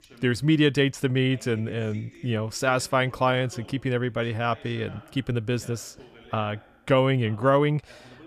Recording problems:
voice in the background; faint; throughout; 25 dB below the speech

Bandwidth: 14.5 kHz